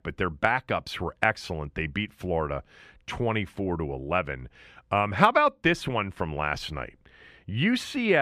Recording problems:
abrupt cut into speech; at the end

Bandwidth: 14.5 kHz